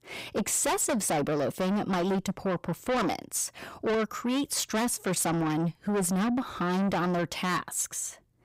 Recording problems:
distortion; heavy; 6 dB below the speech

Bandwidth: 15.5 kHz